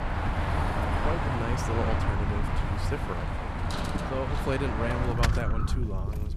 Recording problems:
traffic noise; very loud; throughout; 2 dB above the speech
low rumble; noticeable; throughout; 10 dB below the speech

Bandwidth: 14.5 kHz